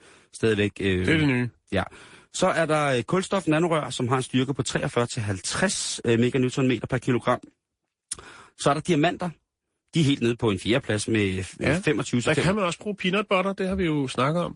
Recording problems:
garbled, watery; slightly; nothing above 10.5 kHz

